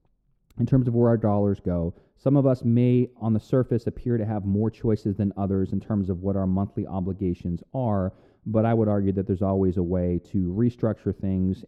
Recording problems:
muffled; very; fading above 1 kHz

